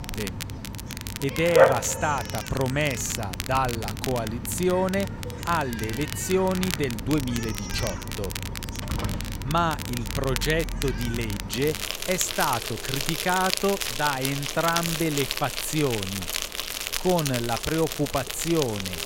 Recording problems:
animal sounds; loud; throughout; 3 dB below the speech
crackle, like an old record; loud; 9 dB below the speech

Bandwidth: 16 kHz